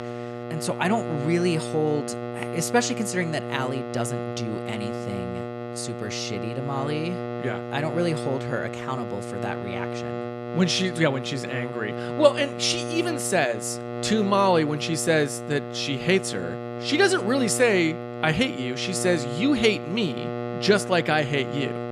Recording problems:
electrical hum; loud; throughout; 60 Hz, 8 dB below the speech

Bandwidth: 15 kHz